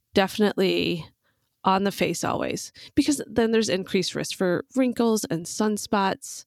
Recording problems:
none

